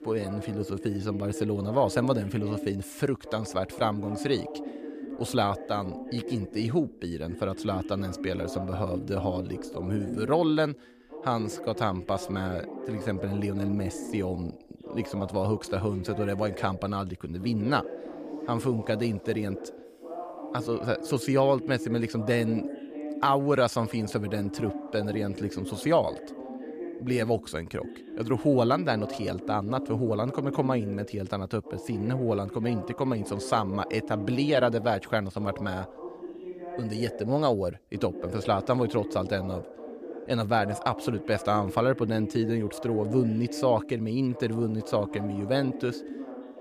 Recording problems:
voice in the background; loud; throughout; 10 dB below the speech

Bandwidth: 15 kHz